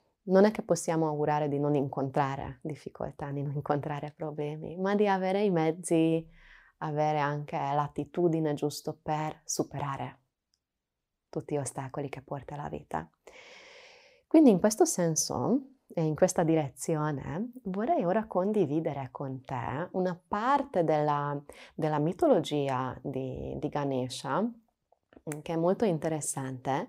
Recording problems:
none

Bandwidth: 15.5 kHz